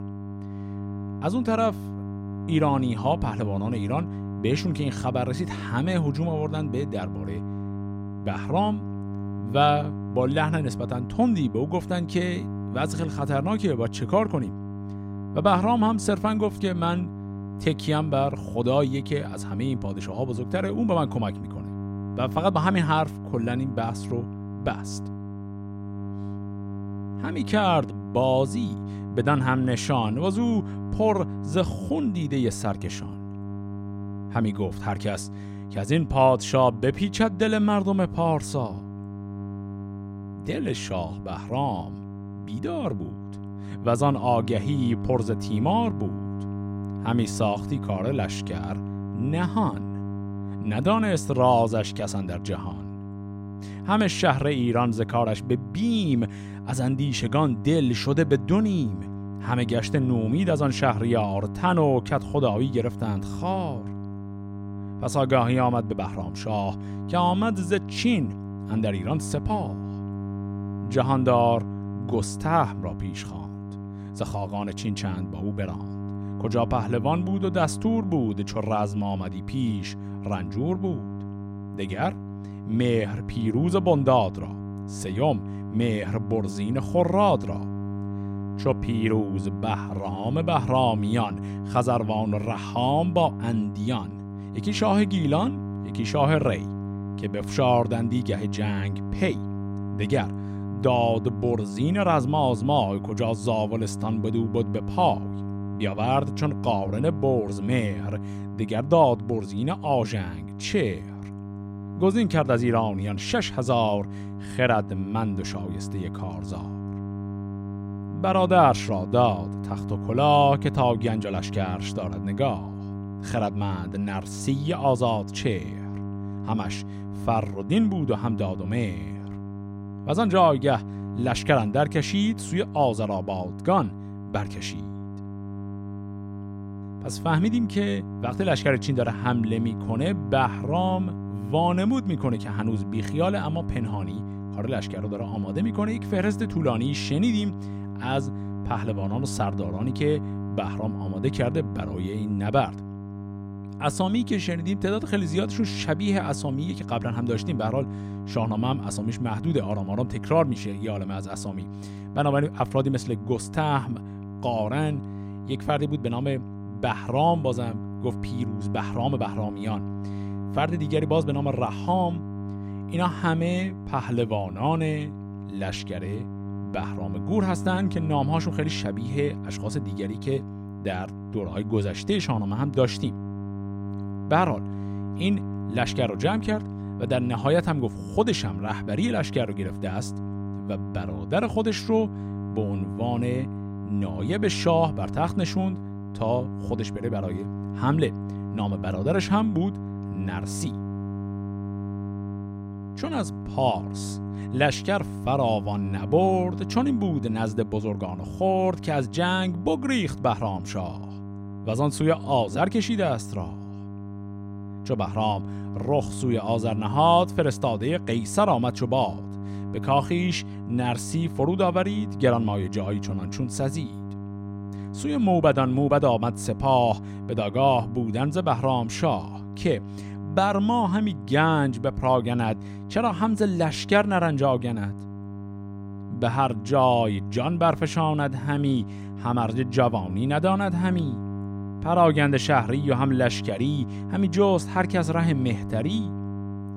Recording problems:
electrical hum; noticeable; throughout; 50 Hz, 15 dB below the speech

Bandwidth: 16 kHz